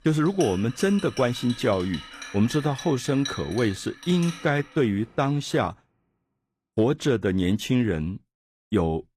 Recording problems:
household noises; noticeable; until 5 s; 15 dB below the speech

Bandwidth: 14.5 kHz